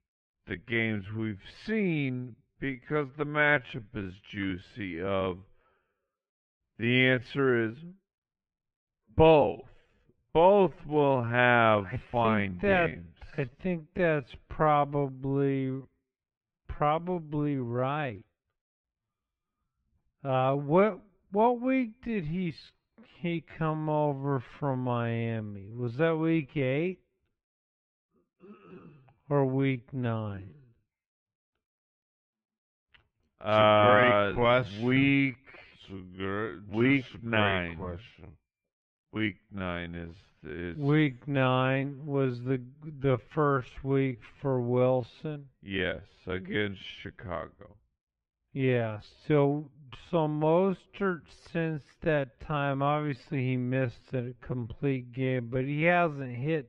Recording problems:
muffled; very; fading above 2.5 kHz
wrong speed, natural pitch; too slow; 0.5 times normal speed

